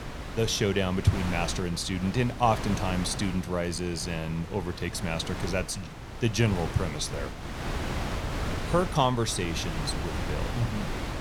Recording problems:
wind noise on the microphone; heavy; 7 dB below the speech

